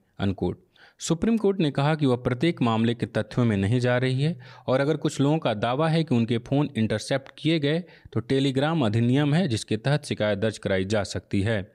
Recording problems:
none

